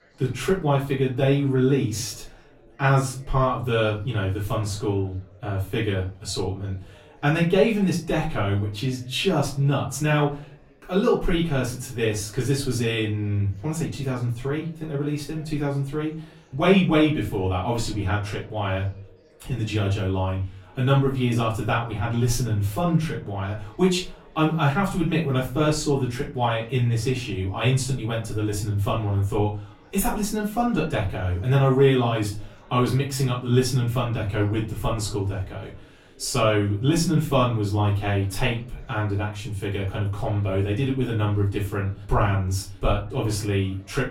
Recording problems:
off-mic speech; far
room echo; slight; dies away in 0.3 s
chatter from many people; faint; throughout; 30 dB below the speech

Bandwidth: 16 kHz